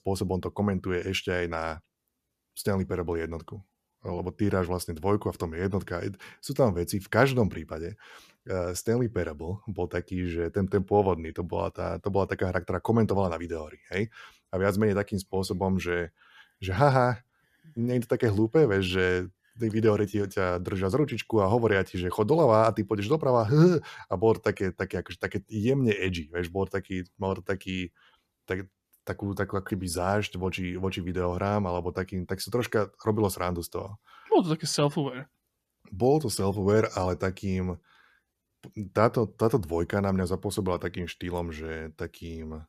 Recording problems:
none

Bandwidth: 14.5 kHz